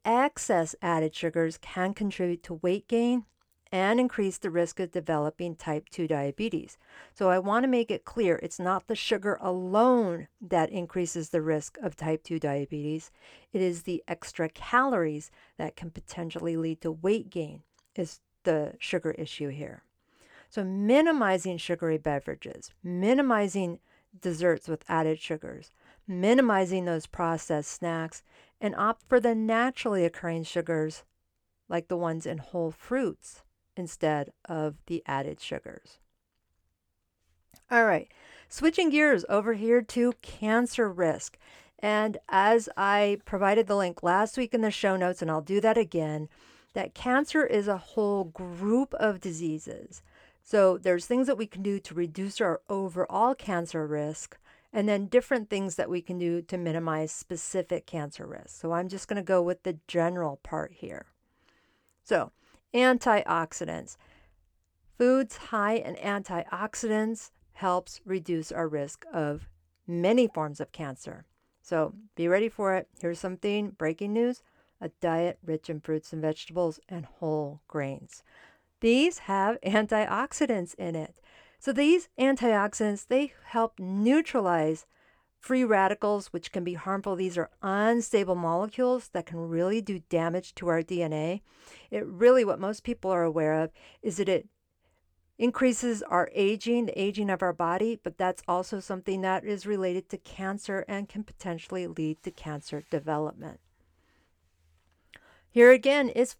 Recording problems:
none

